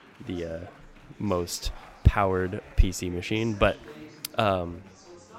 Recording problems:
chatter from many people; faint; throughout; 20 dB below the speech

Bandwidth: 16 kHz